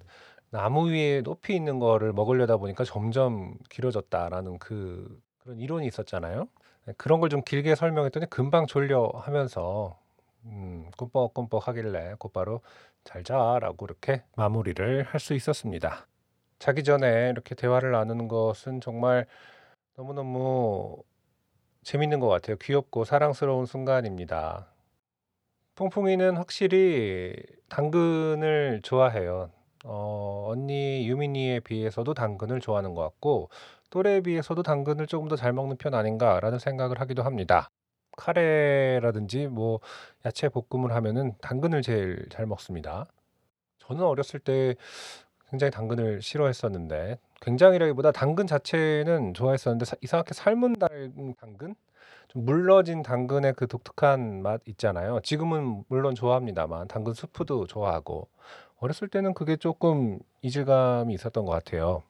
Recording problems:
none

